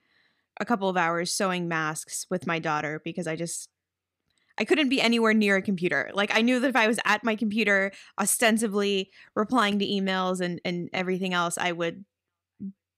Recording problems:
none

